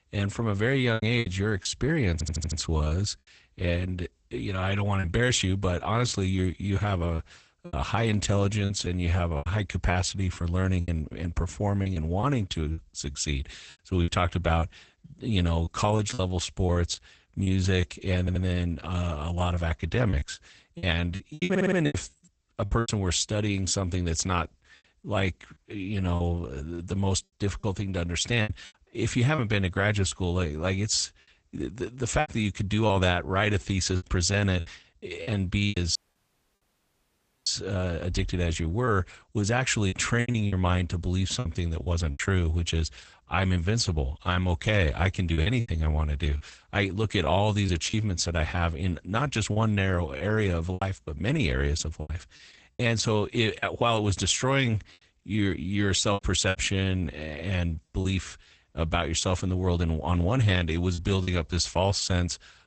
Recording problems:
garbled, watery; badly; nothing above 8 kHz
choppy; very; 6% of the speech affected
audio stuttering; at 2 s, at 18 s and at 22 s
audio cutting out; at 36 s for 1.5 s

